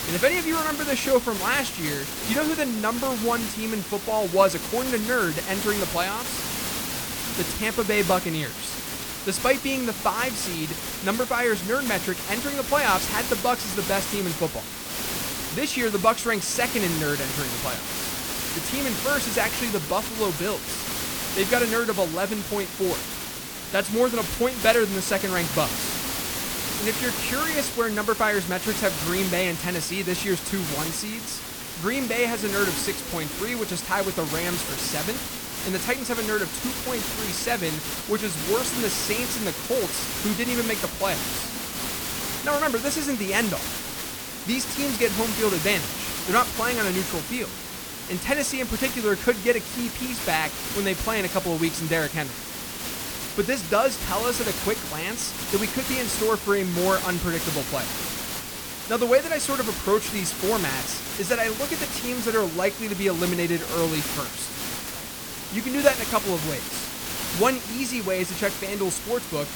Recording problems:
hiss; loud; throughout; 3 dB below the speech
background chatter; faint; throughout; 2 voices, 25 dB below the speech

